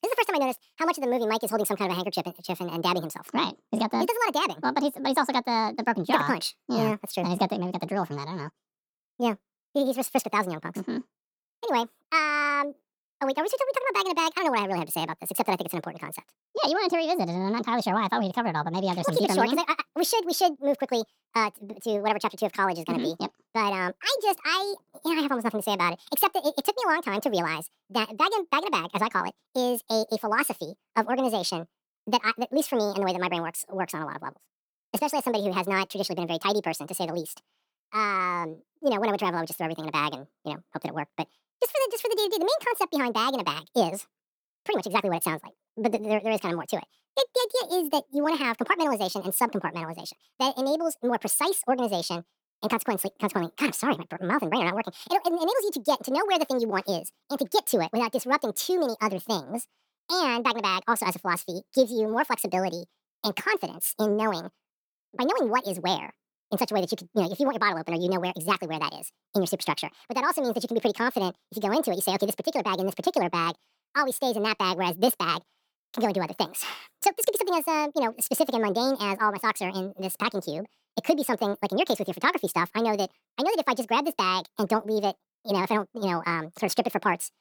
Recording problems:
wrong speed and pitch; too fast and too high; 1.6 times normal speed

